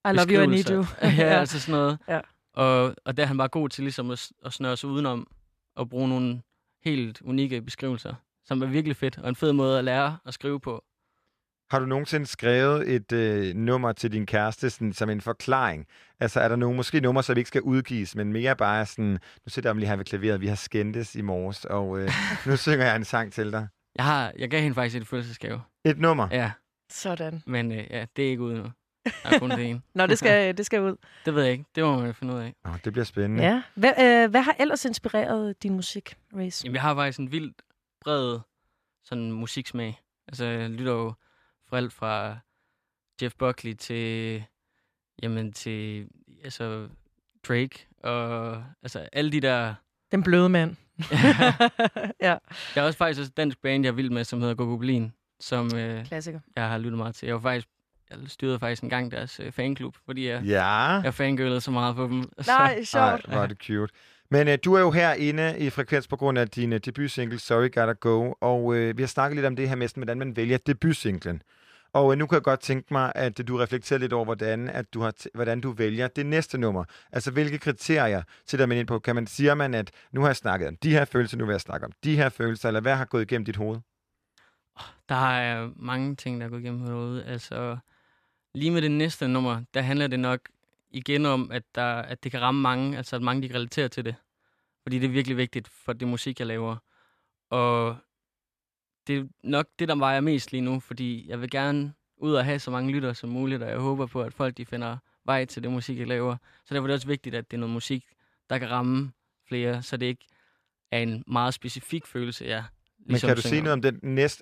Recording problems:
none

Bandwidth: 14.5 kHz